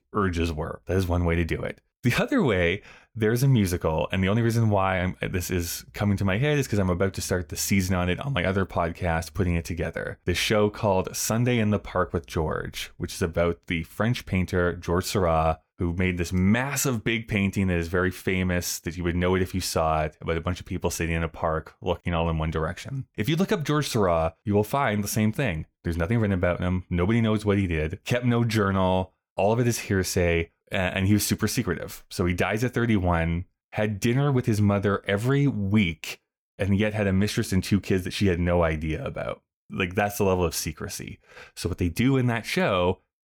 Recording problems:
none

